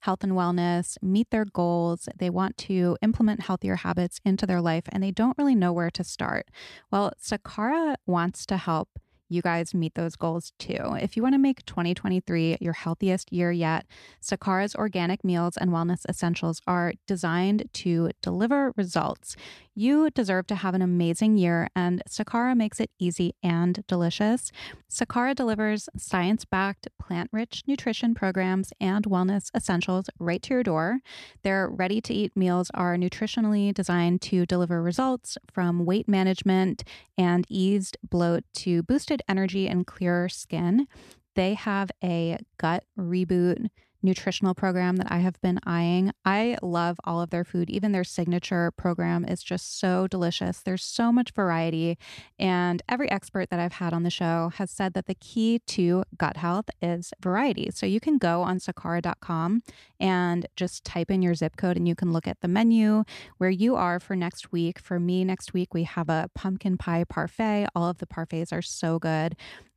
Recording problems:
none

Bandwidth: 14 kHz